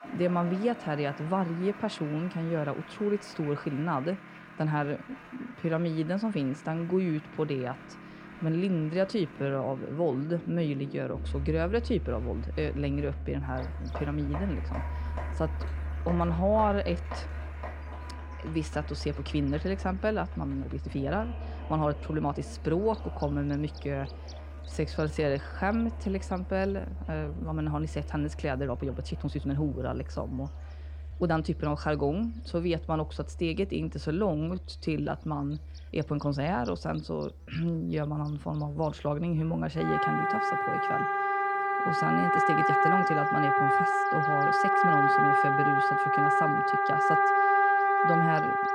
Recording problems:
muffled; slightly; fading above 3.5 kHz
background music; very loud; throughout; 2 dB above the speech
crowd noise; noticeable; throughout; 15 dB below the speech
electrical hum; faint; from 13 s on; 60 Hz, 25 dB below the speech
uneven, jittery; strongly; from 4.5 to 45 s

